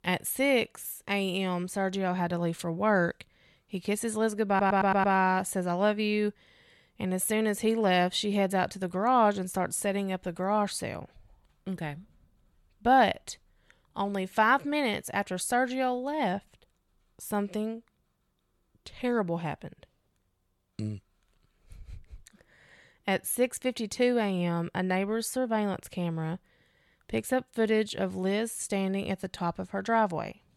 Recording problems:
audio stuttering; at 4.5 s

